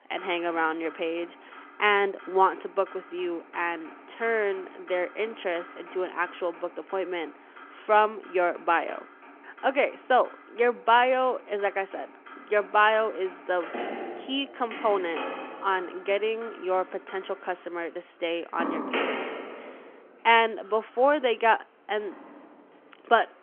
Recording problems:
phone-call audio; nothing above 3 kHz
traffic noise; noticeable; throughout; 15 dB below the speech

